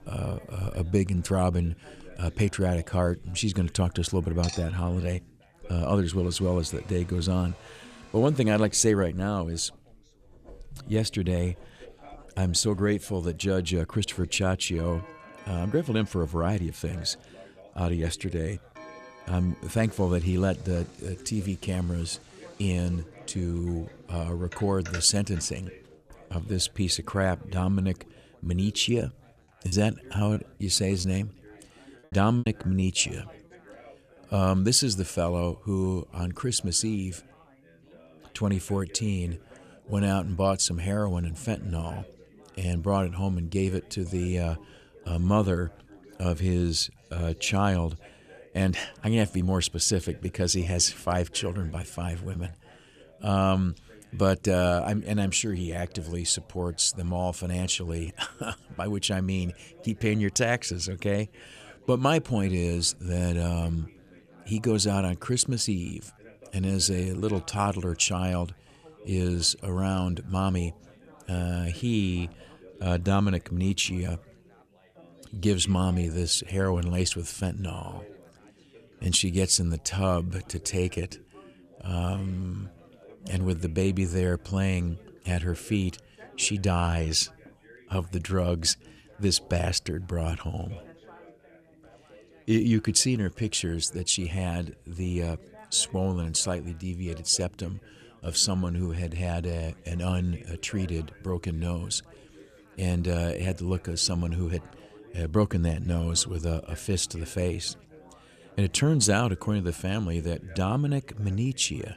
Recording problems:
household noises; faint; until 27 s; 20 dB below the speech
background chatter; faint; throughout; 4 voices, 25 dB below the speech
choppy; very; from 30 to 33 s; 9% of the speech affected

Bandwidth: 14.5 kHz